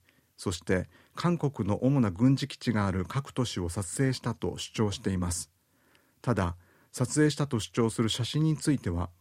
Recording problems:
none

